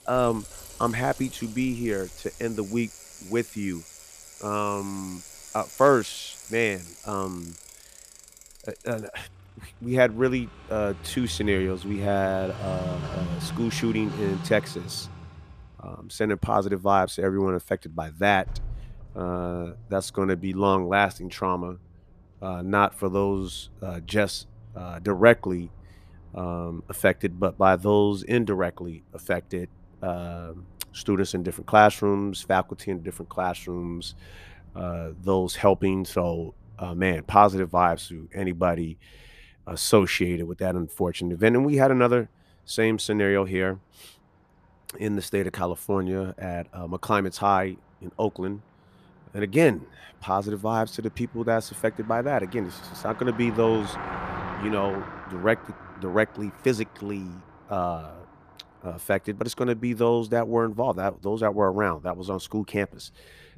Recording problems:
traffic noise; noticeable; throughout; 15 dB below the speech

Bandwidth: 14.5 kHz